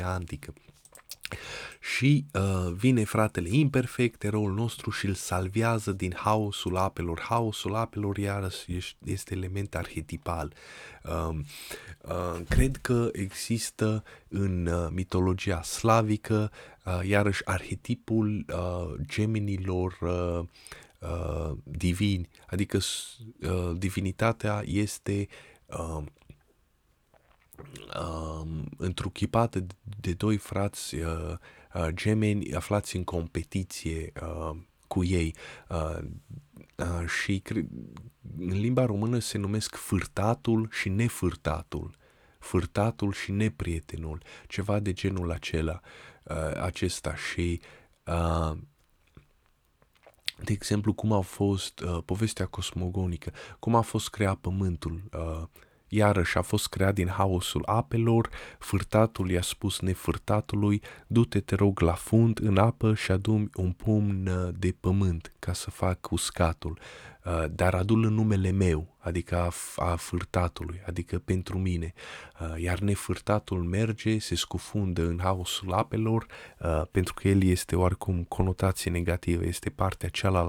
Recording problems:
abrupt cut into speech; at the start and the end

